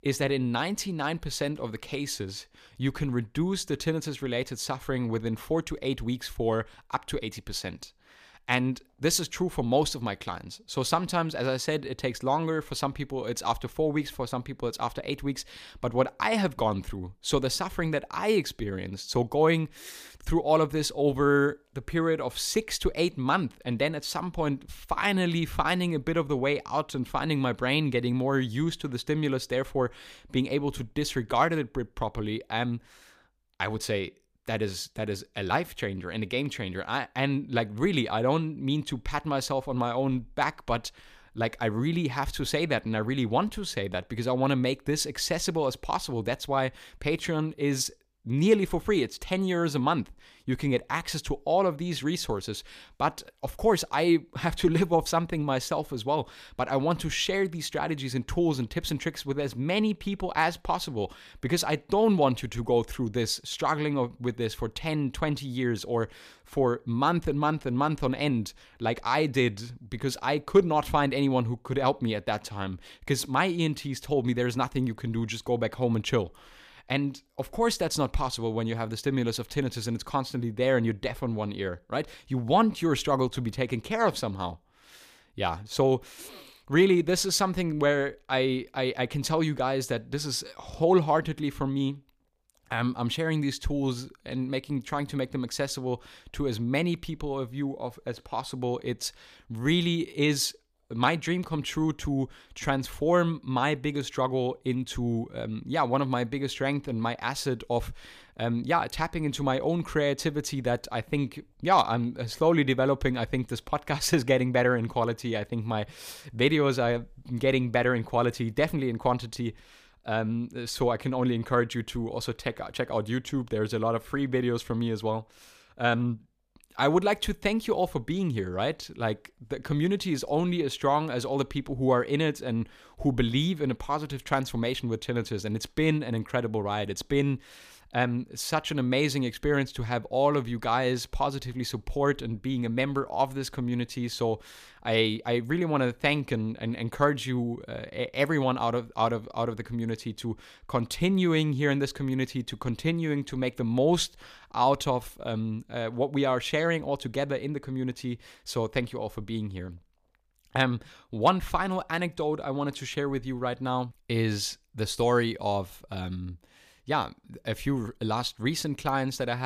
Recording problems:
abrupt cut into speech; at the end

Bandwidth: 15 kHz